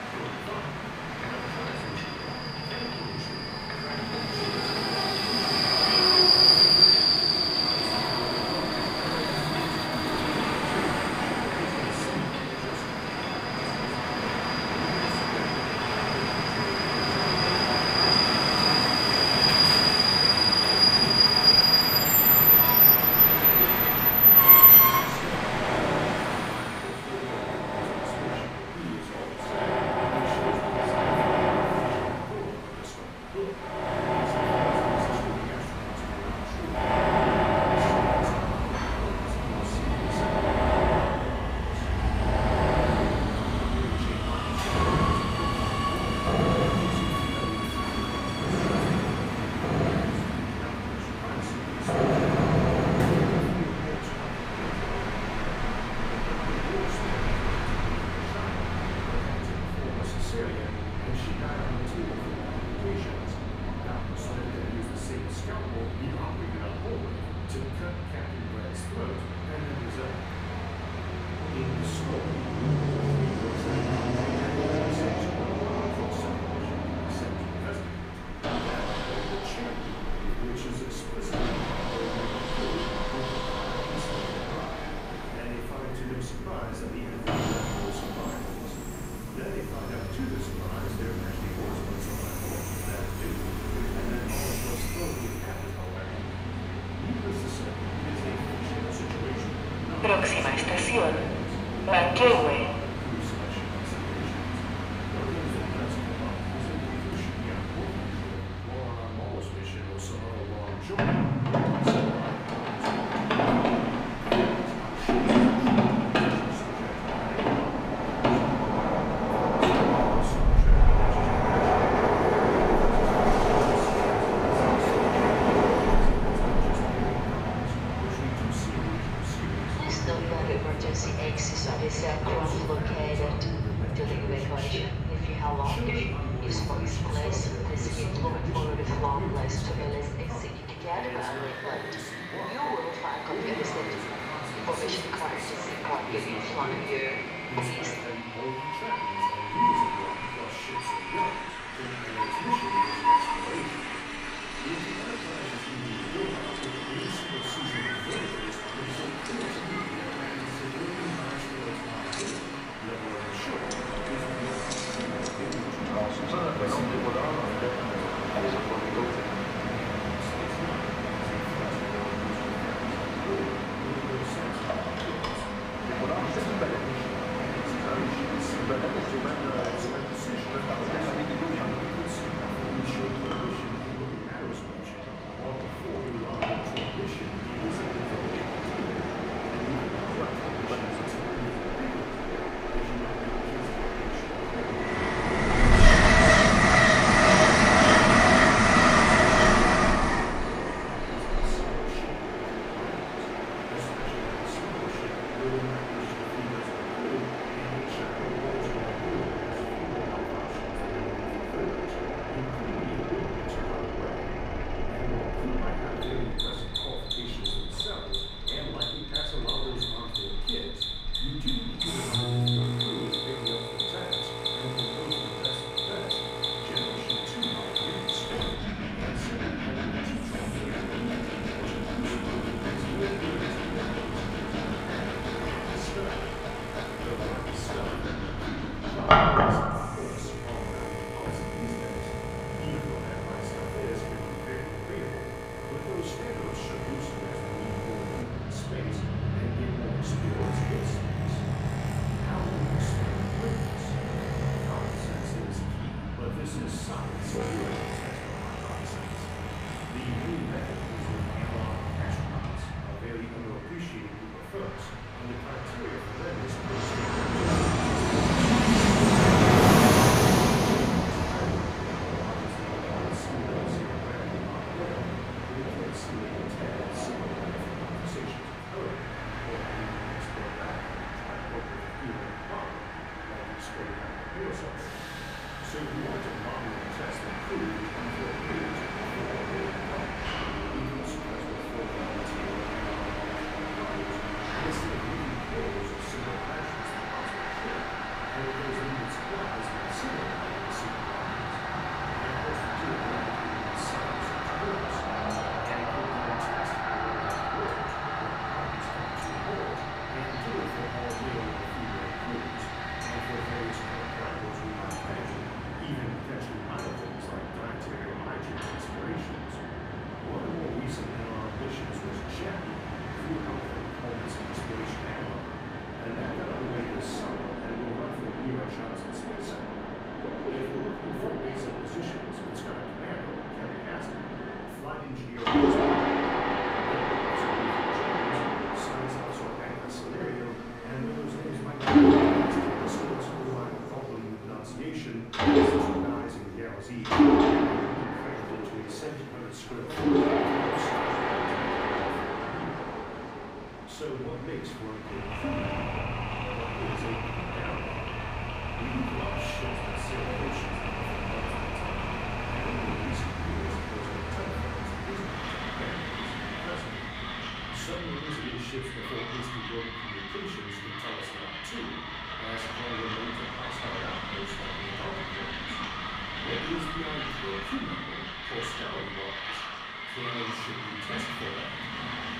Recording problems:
off-mic speech; far
room echo; noticeable; dies away in 0.7 s
echo of what is said; faint; throughout; 260 ms later, 20 dB below the speech
machinery noise; very loud; throughout; 6 dB above the speech
train or aircraft noise; very loud; throughout; 10 dB above the speech

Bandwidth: 15.5 kHz